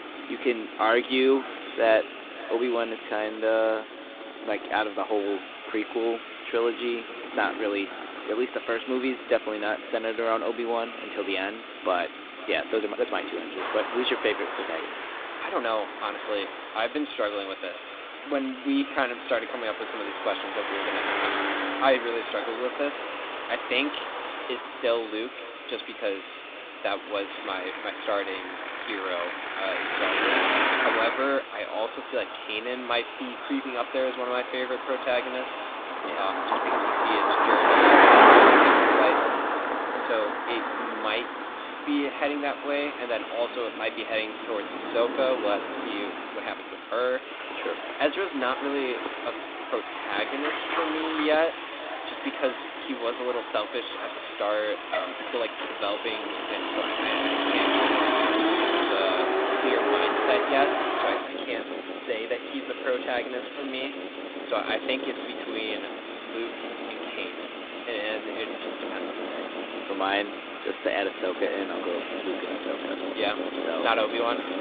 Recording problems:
echo of what is said; faint; throughout; 510 ms later, 20 dB below the speech
phone-call audio; nothing above 3.5 kHz
traffic noise; very loud; throughout; 3 dB above the speech
hiss; noticeable; throughout; 10 dB below the speech
uneven, jittery; strongly; from 1 s to 1:05

